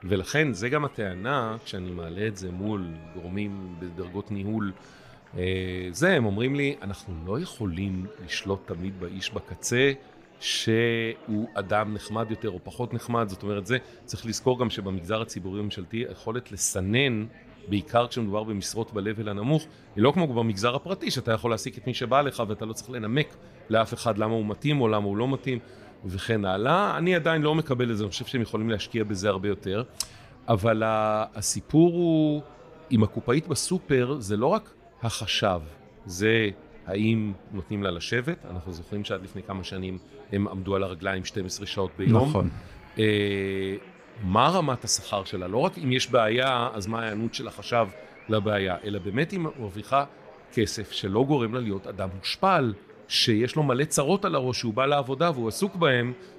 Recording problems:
chatter from many people; faint; throughout; 25 dB below the speech

